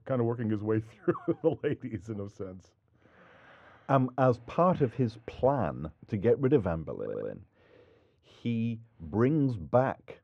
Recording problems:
muffled; very; fading above 3.5 kHz
audio stuttering; at 7 s

